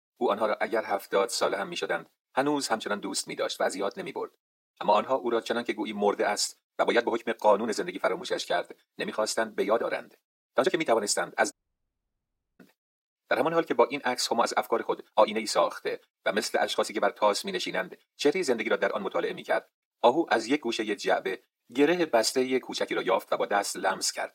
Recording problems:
thin; very; fading below 350 Hz
wrong speed, natural pitch; too fast; 1.7 times normal speed
uneven, jittery; strongly; from 0.5 to 23 s
audio cutting out; at 12 s for 1 s

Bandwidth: 16 kHz